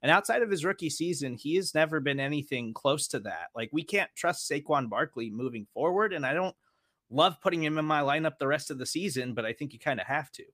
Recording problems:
none

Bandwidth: 15 kHz